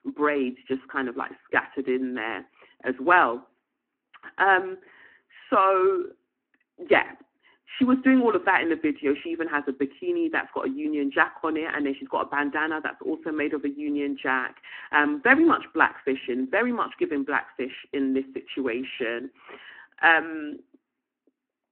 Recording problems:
phone-call audio

